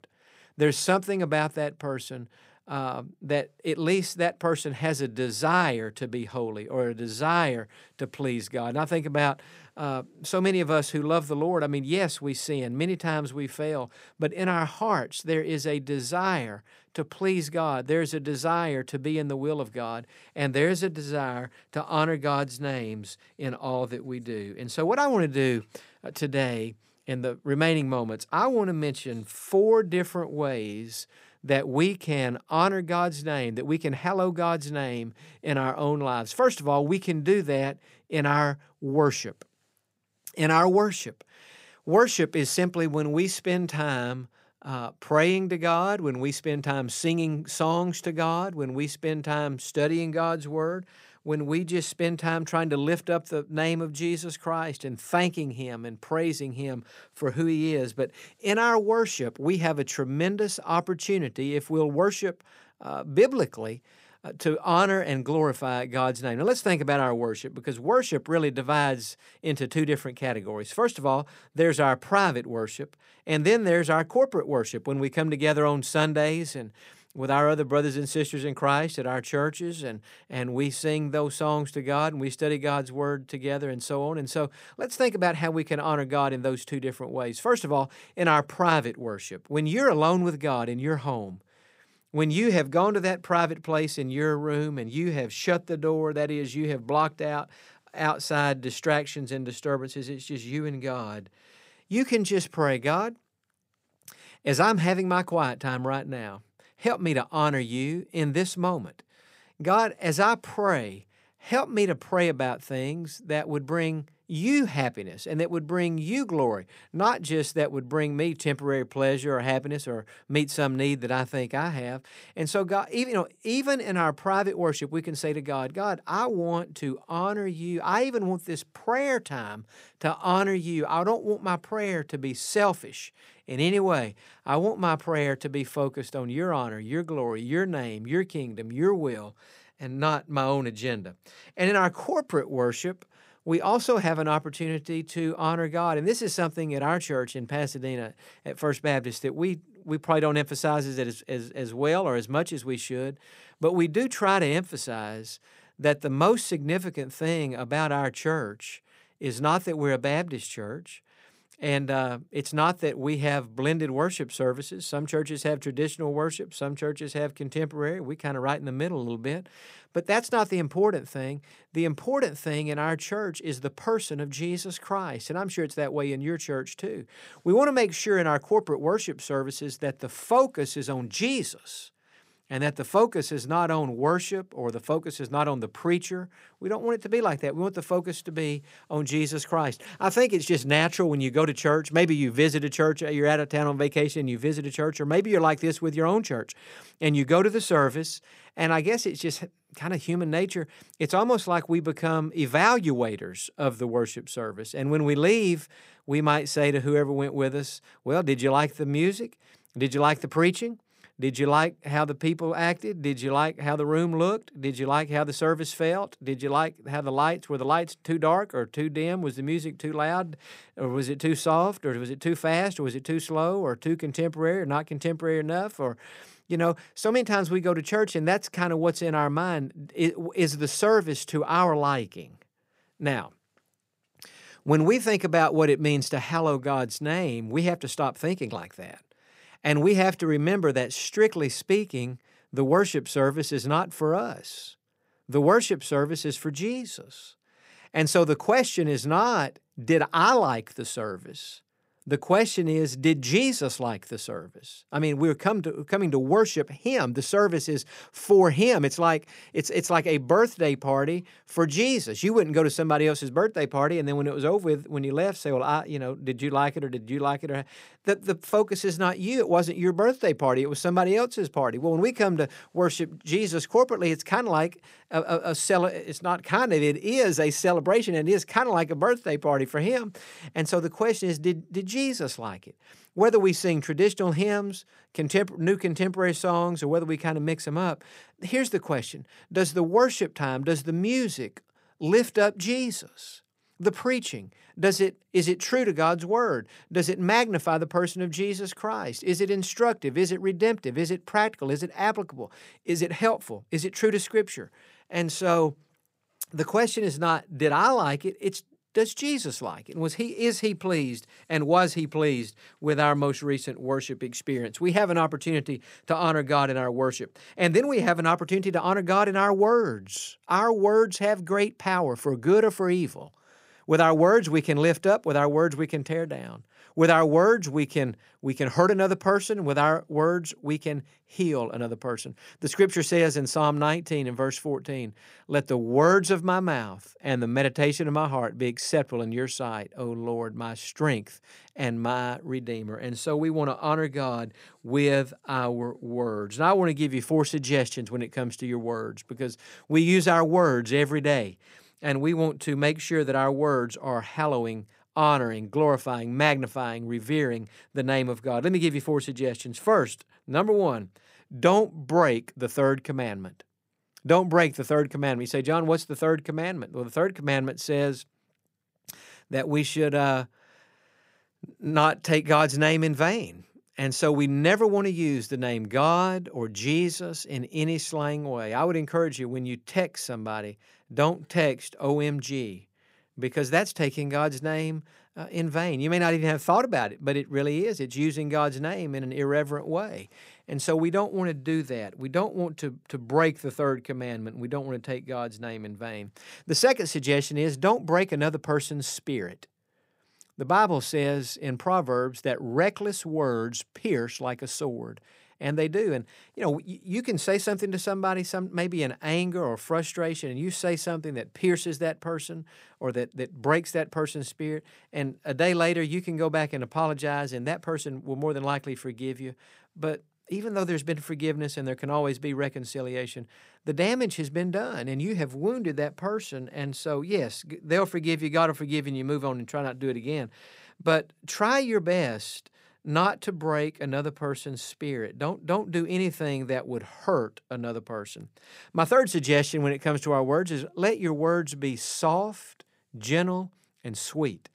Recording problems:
none

